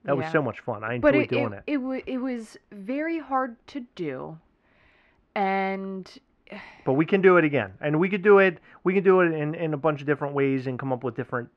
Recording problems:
muffled; very; fading above 2 kHz

